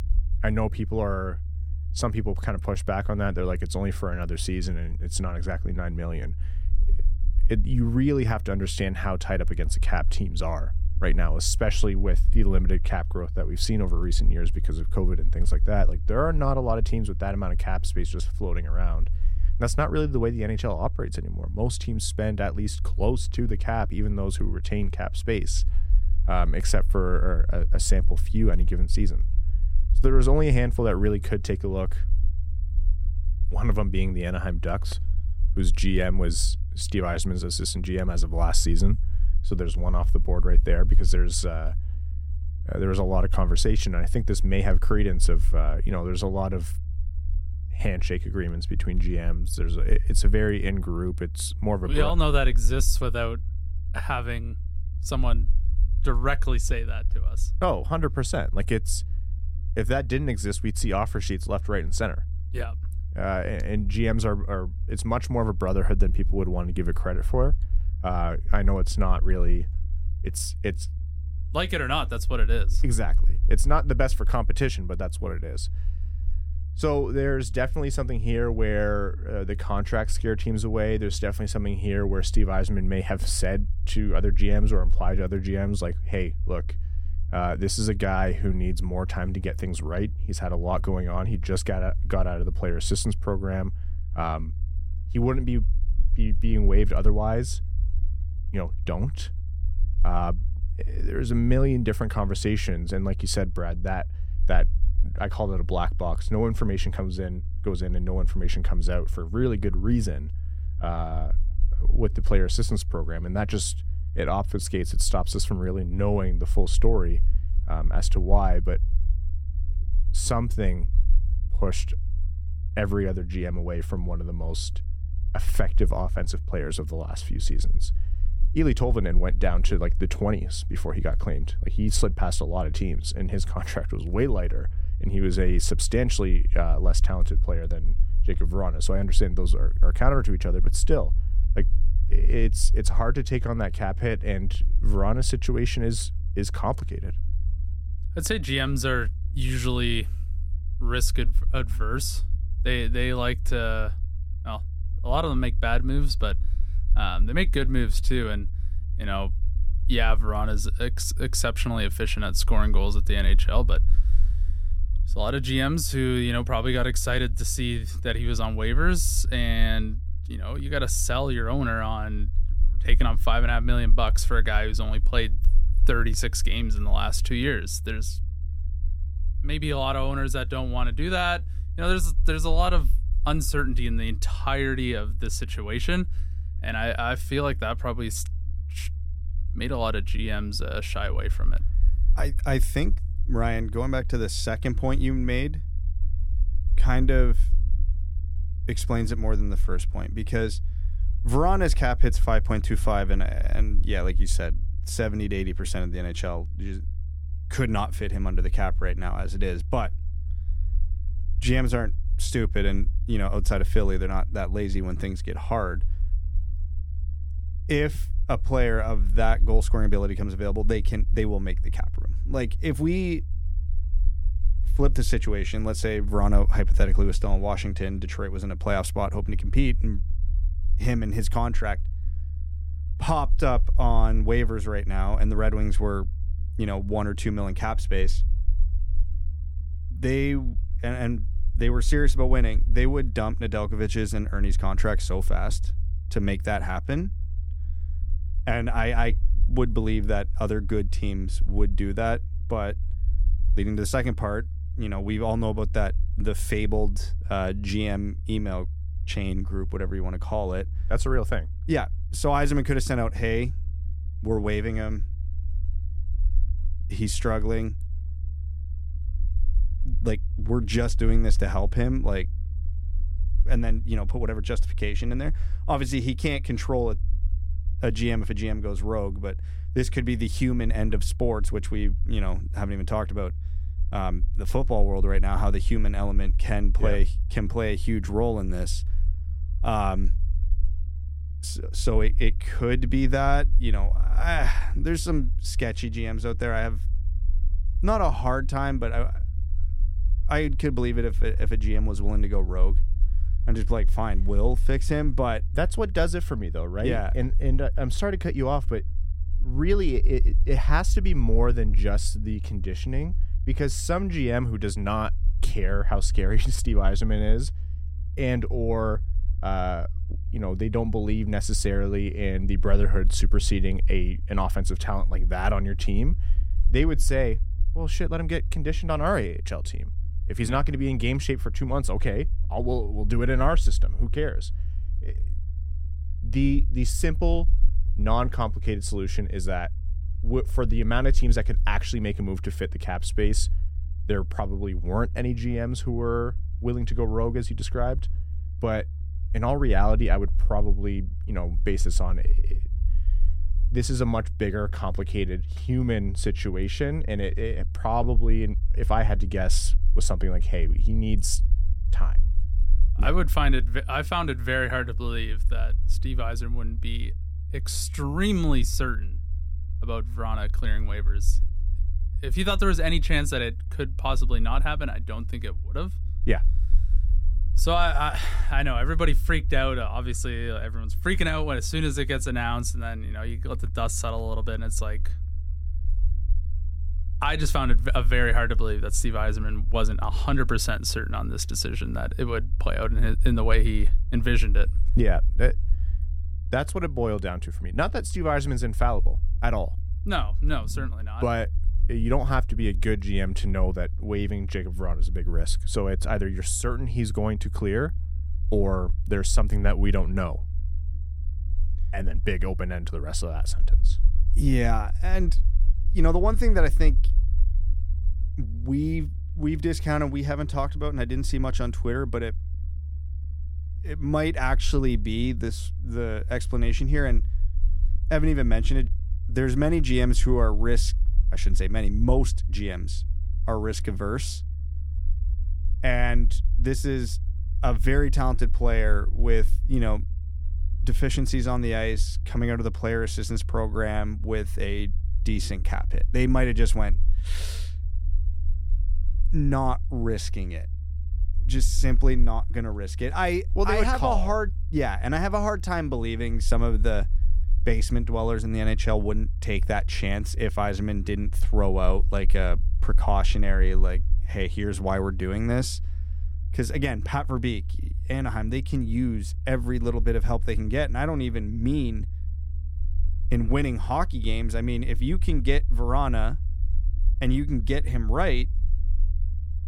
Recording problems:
low rumble; faint; throughout; 20 dB below the speech

